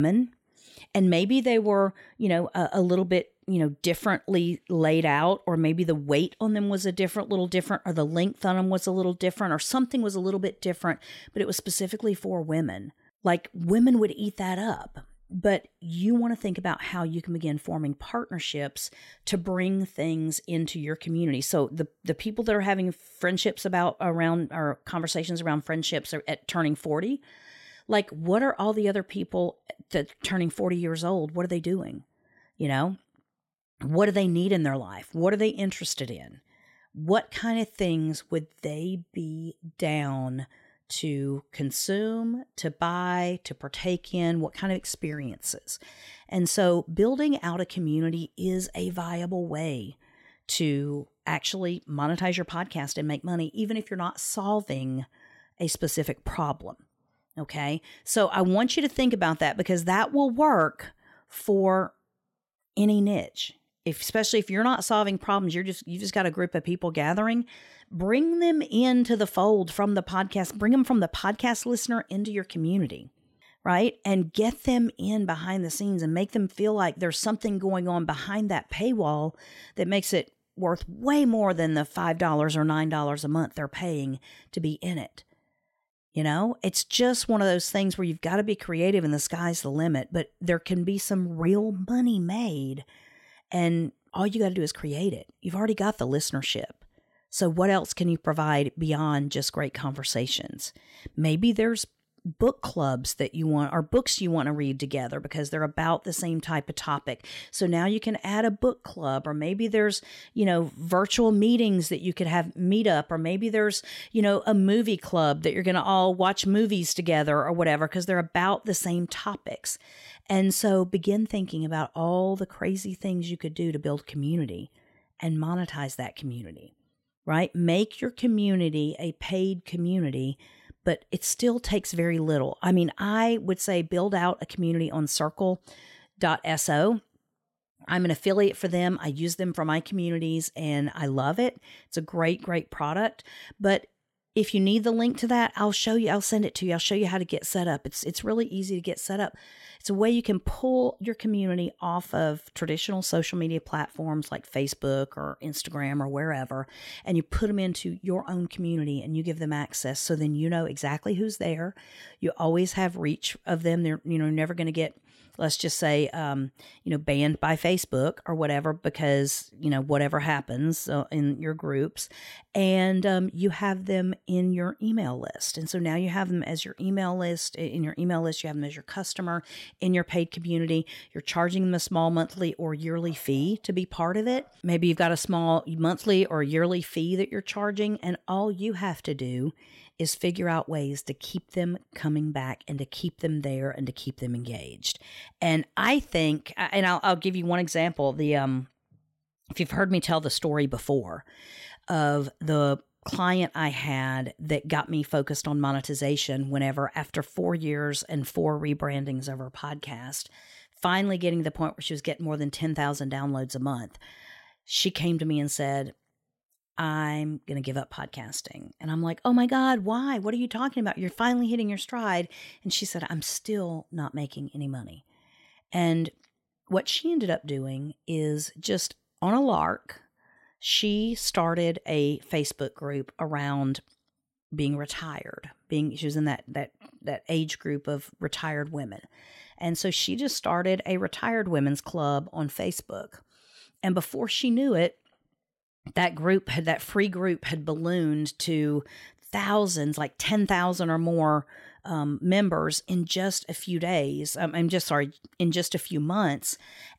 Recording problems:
abrupt cut into speech; at the start

